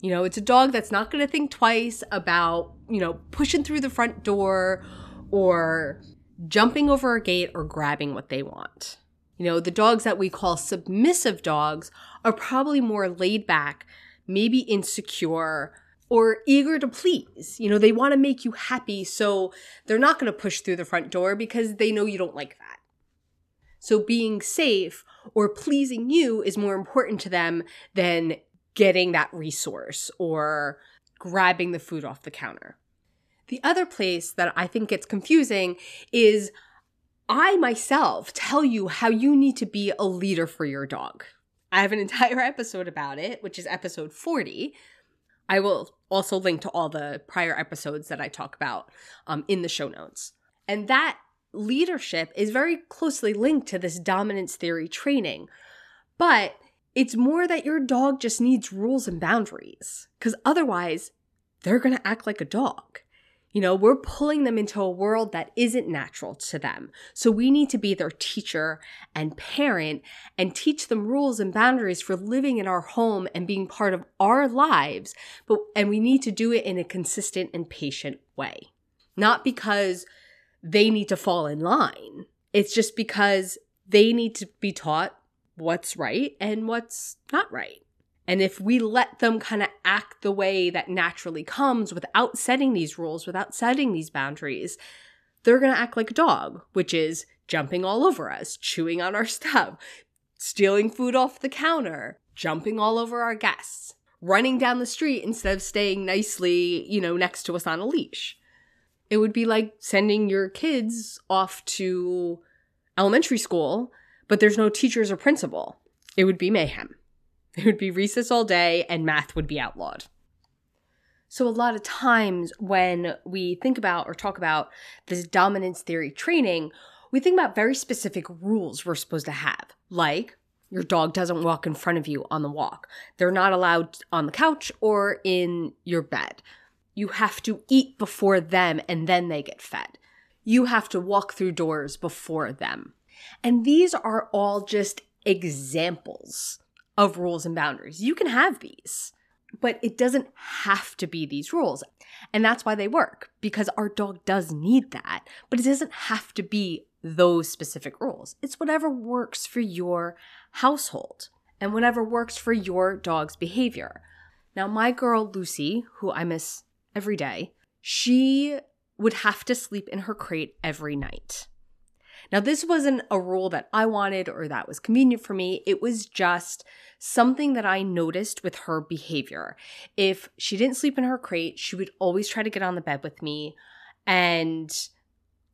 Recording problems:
none

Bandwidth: 14.5 kHz